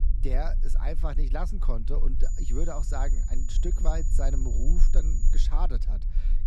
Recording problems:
high-pitched whine; loud; from 2 to 5.5 s; 7 kHz, 8 dB below the speech
low rumble; noticeable; throughout; 15 dB below the speech

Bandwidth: 14 kHz